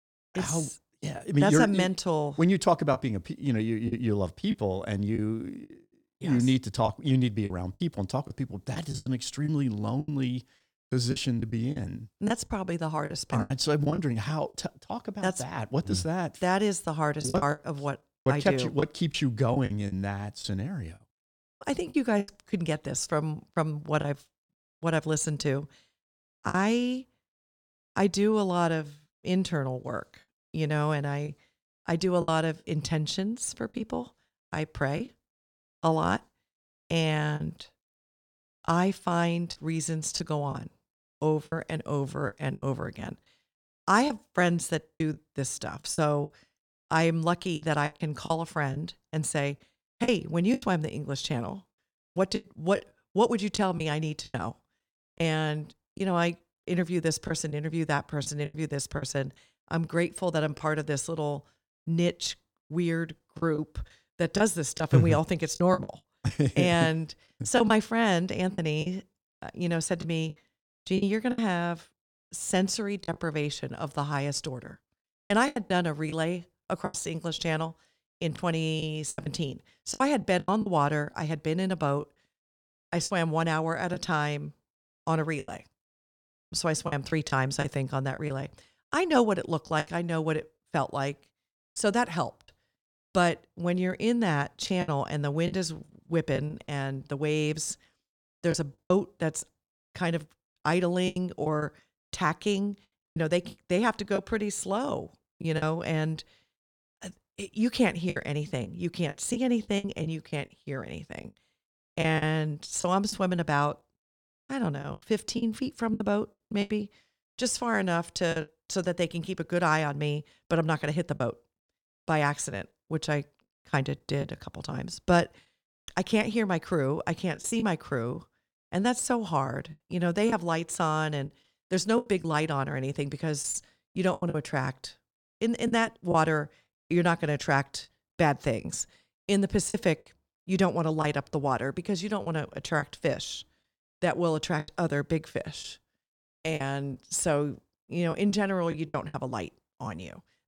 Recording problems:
choppy; very; 6% of the speech affected

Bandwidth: 17.5 kHz